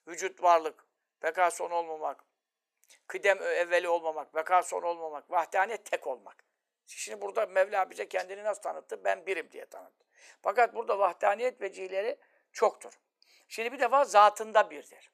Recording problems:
thin; very; fading below 450 Hz

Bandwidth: 14.5 kHz